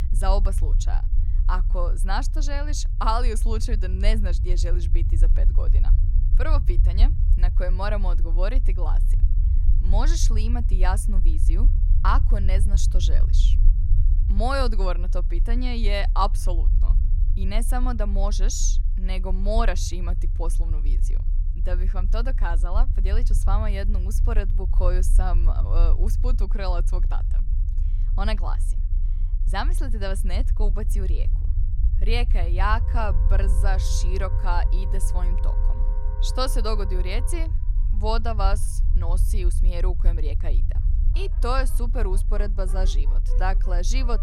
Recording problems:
background music; noticeable; from 33 s on; 15 dB below the speech
low rumble; noticeable; throughout; 15 dB below the speech

